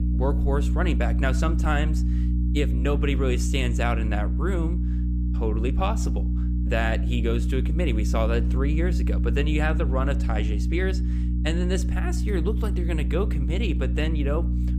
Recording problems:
electrical hum; loud; throughout; 60 Hz, 8 dB below the speech

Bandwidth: 15.5 kHz